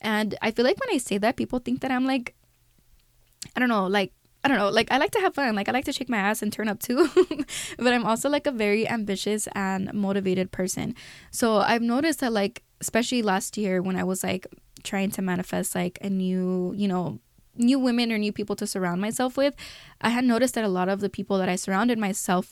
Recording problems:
none

